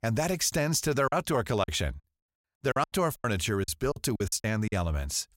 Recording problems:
choppy; very; 12% of the speech affected

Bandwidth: 16 kHz